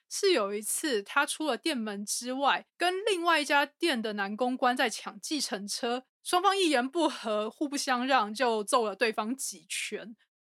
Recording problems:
none

